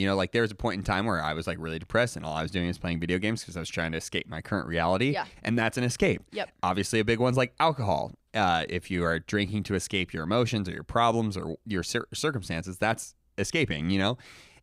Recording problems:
abrupt cut into speech; at the start

